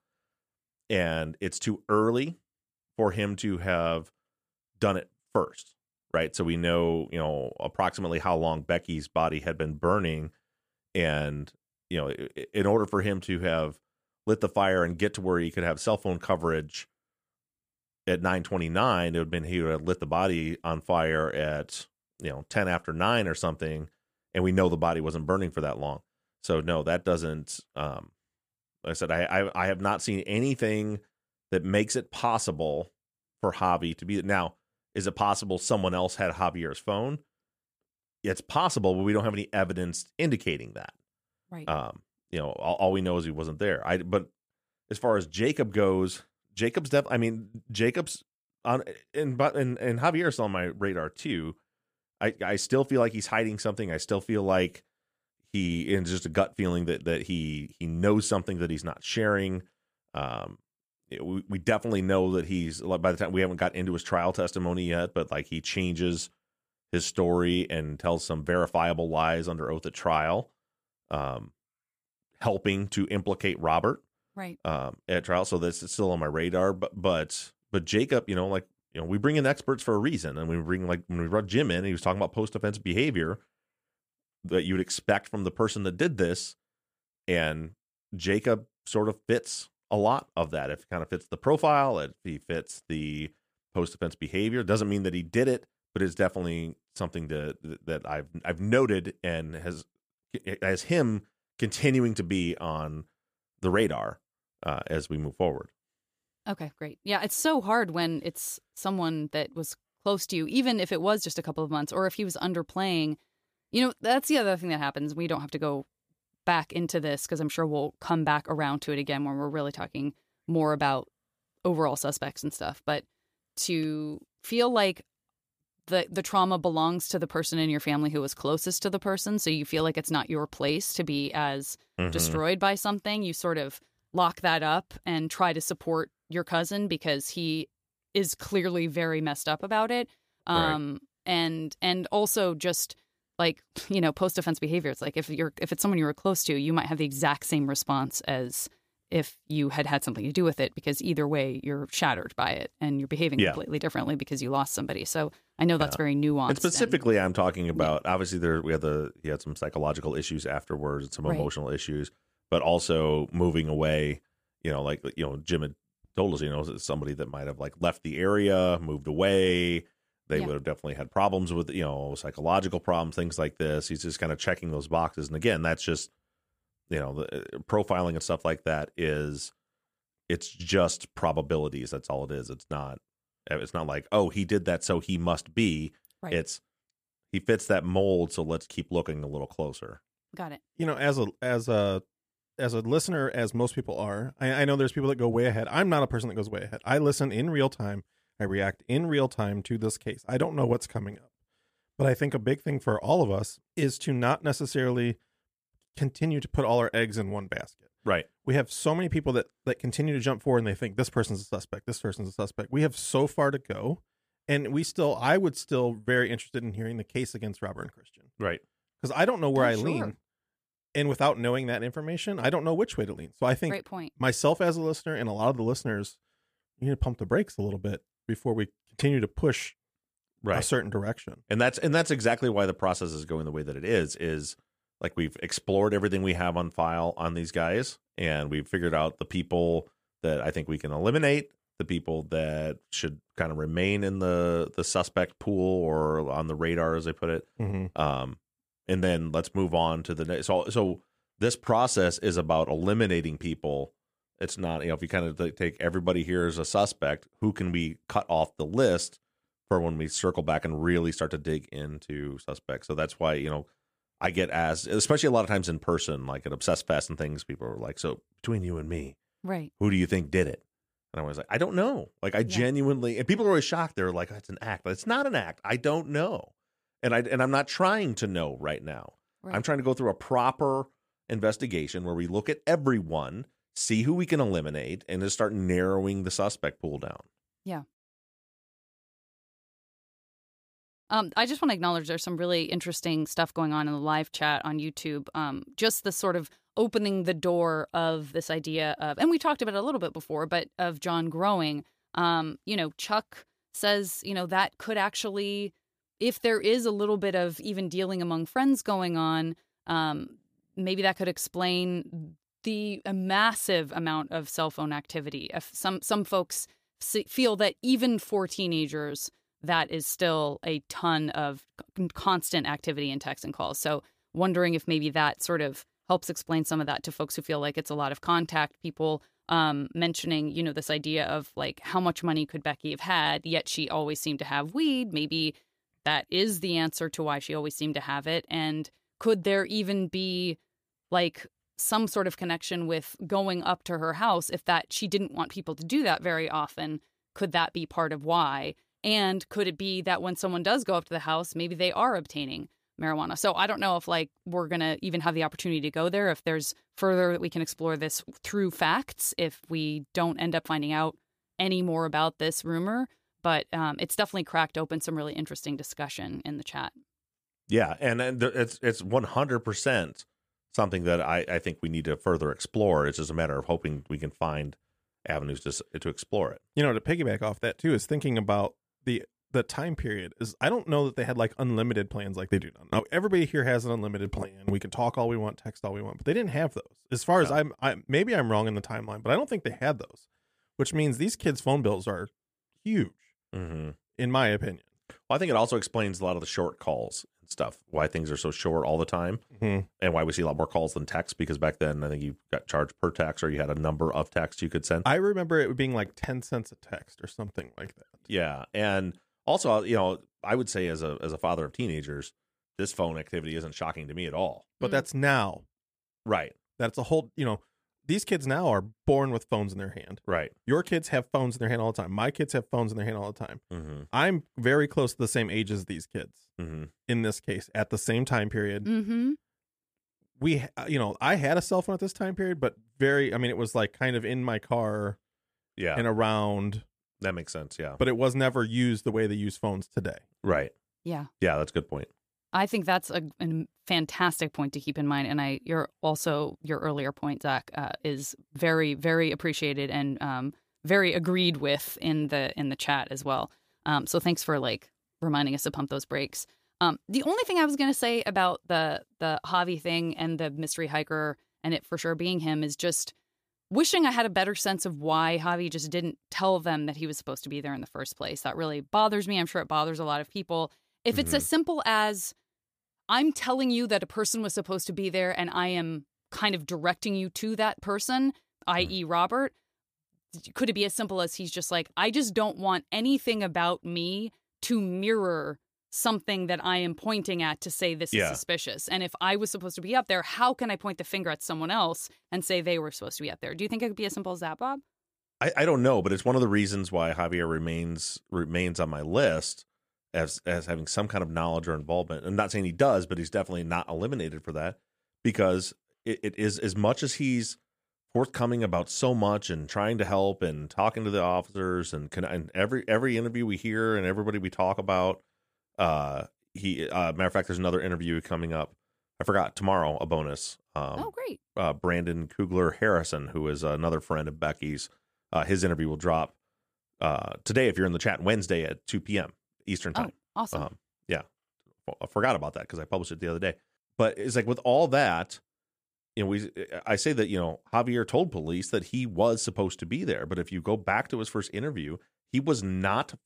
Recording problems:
none

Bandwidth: 15 kHz